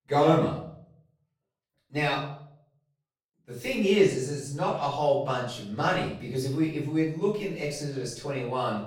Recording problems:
off-mic speech; far
room echo; noticeable; dies away in 0.5 s

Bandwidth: 17 kHz